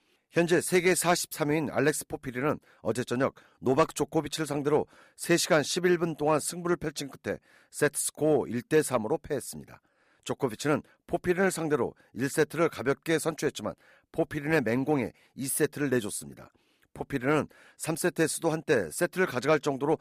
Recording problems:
none

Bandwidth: 15 kHz